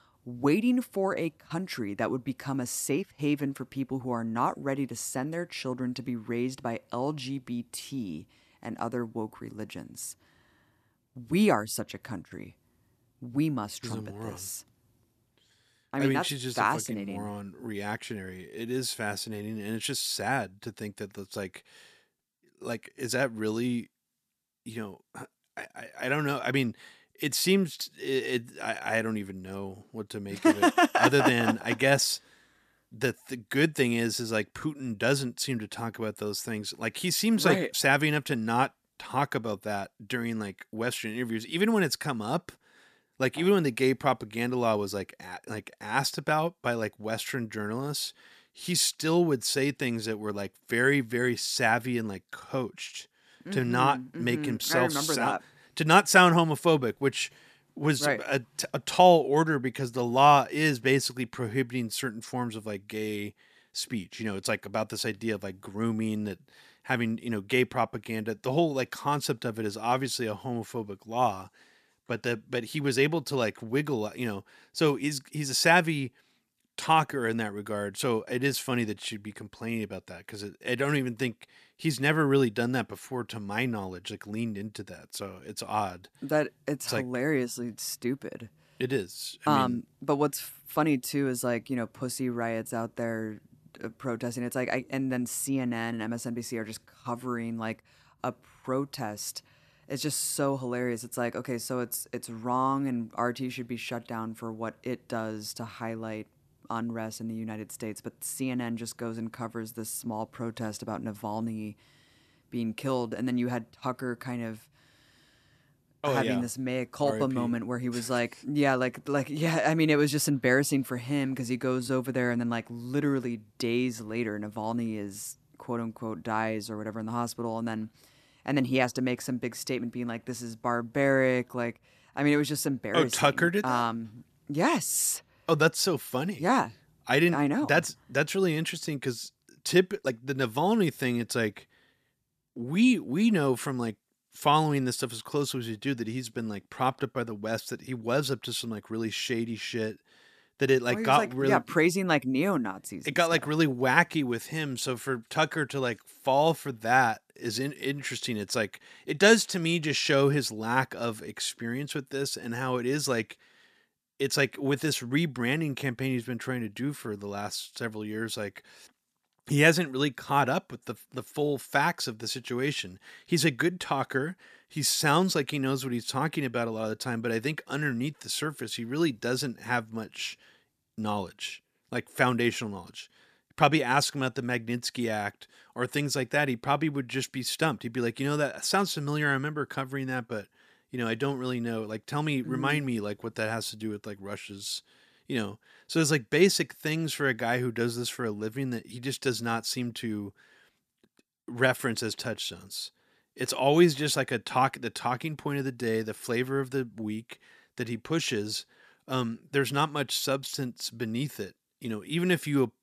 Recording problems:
uneven, jittery; slightly; from 1:39 to 2:20

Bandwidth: 14.5 kHz